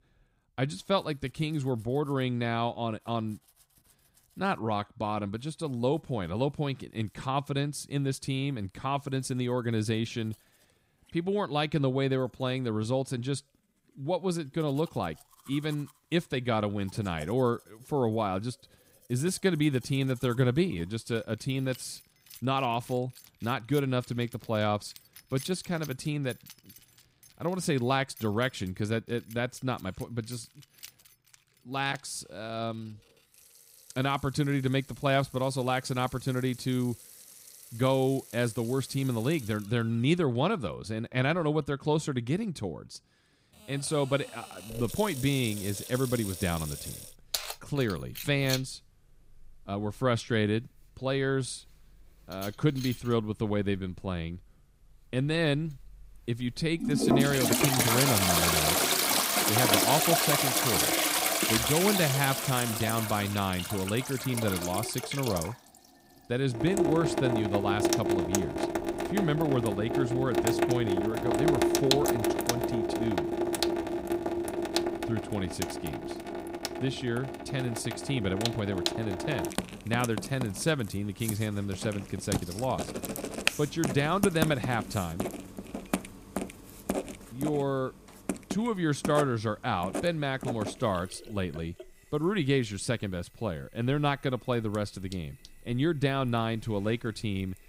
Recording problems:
household noises; very loud; throughout; as loud as the speech

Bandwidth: 15.5 kHz